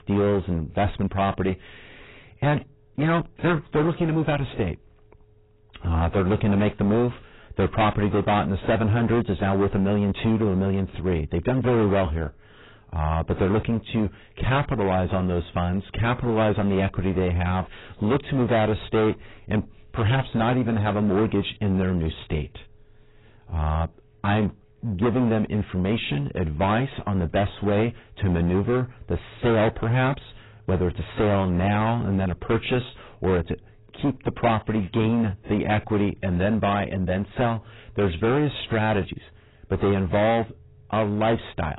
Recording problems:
distortion; heavy; 15% of the sound clipped
garbled, watery; badly; nothing above 4 kHz

